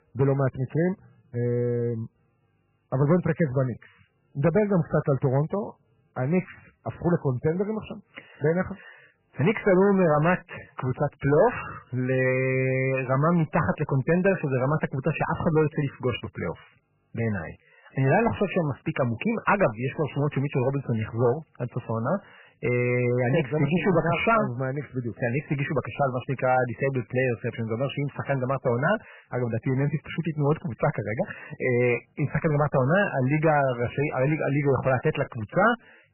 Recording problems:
garbled, watery; badly; nothing above 3 kHz
distortion; slight; 4% of the sound clipped

